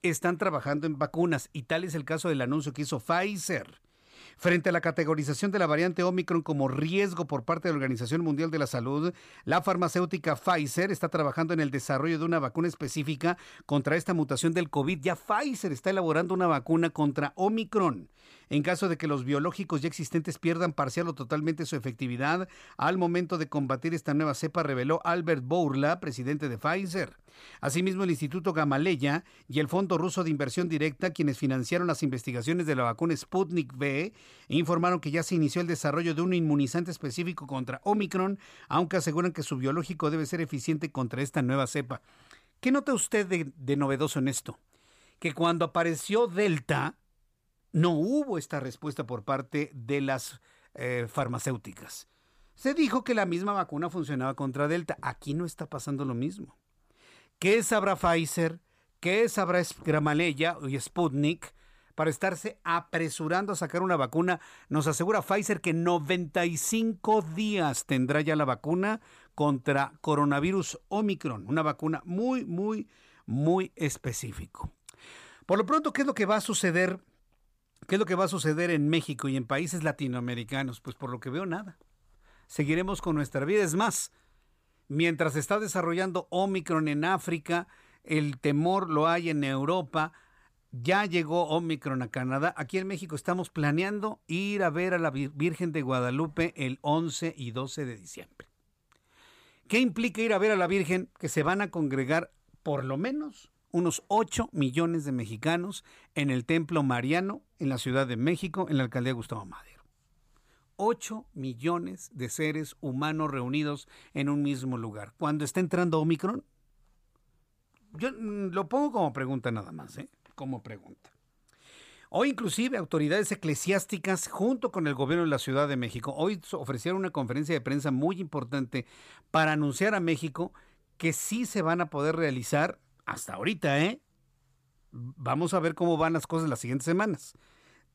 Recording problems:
none

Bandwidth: 15 kHz